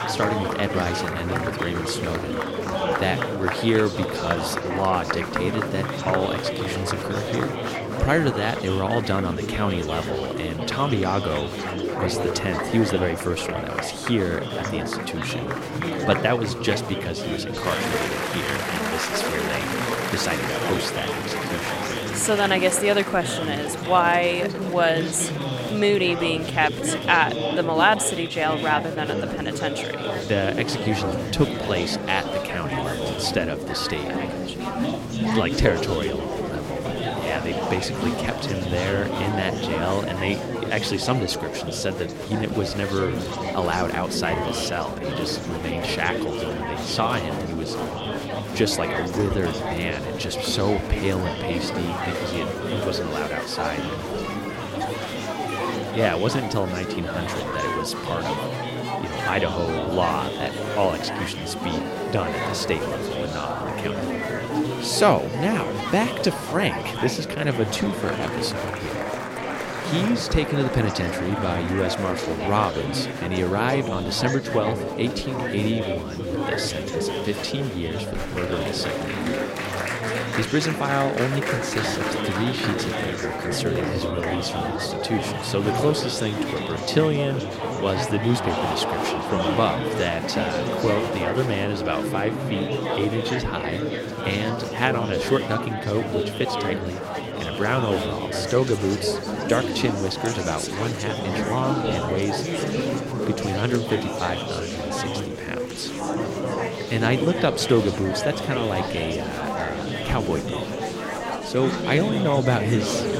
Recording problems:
chatter from many people; loud; throughout; 2 dB below the speech

